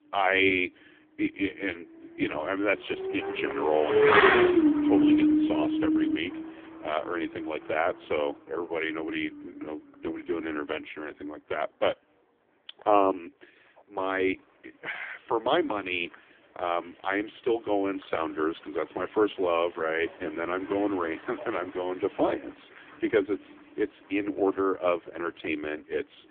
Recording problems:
phone-call audio; poor line; nothing above 3.5 kHz
traffic noise; very loud; throughout; 6 dB above the speech

